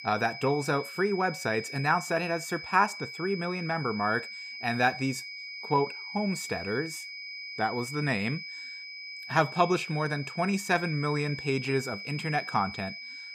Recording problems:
high-pitched whine; loud; throughout; 2.5 kHz, 9 dB below the speech

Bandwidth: 15 kHz